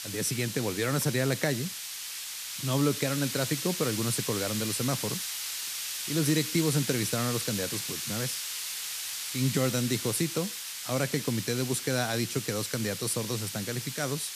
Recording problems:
hiss; loud; throughout; 3 dB below the speech

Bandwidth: 14.5 kHz